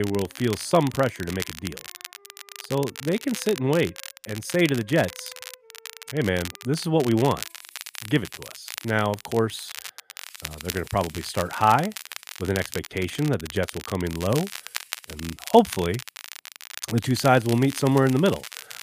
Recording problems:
crackle, like an old record; noticeable; 15 dB below the speech
background music; faint; throughout; 30 dB below the speech
abrupt cut into speech; at the start

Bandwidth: 15 kHz